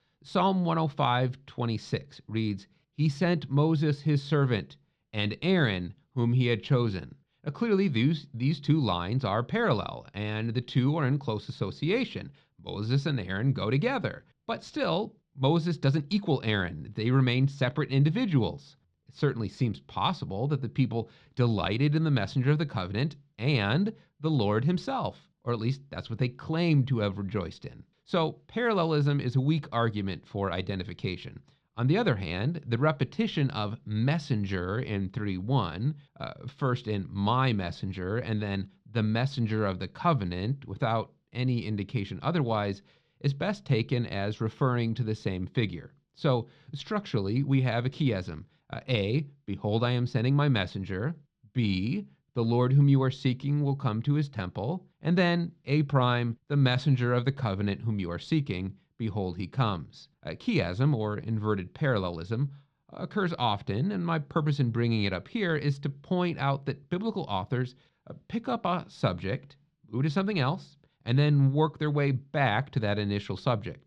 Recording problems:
muffled; very slightly; fading above 4 kHz

